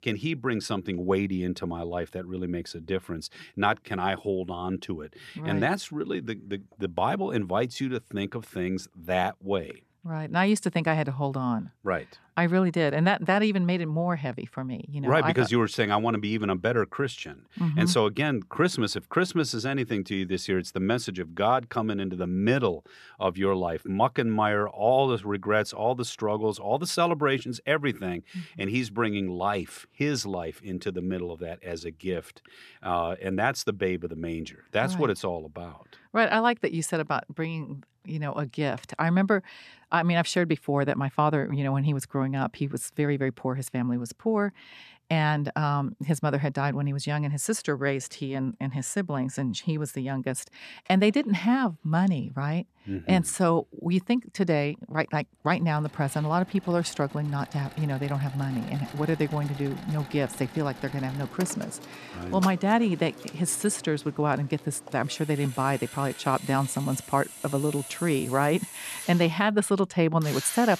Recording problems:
machinery noise; noticeable; from 56 s on; 15 dB below the speech

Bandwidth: 13.5 kHz